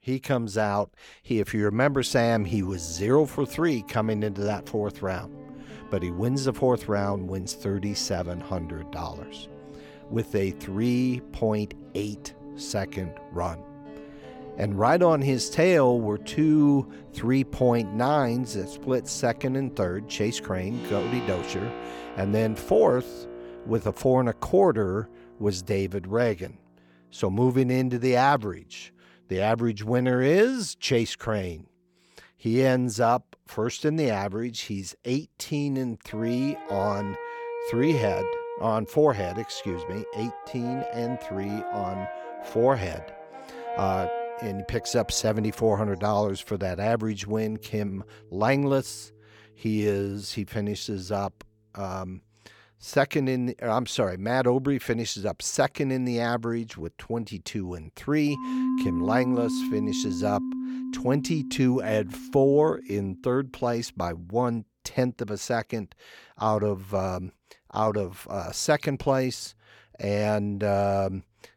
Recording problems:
background music; noticeable; throughout; 10 dB below the speech

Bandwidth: 18 kHz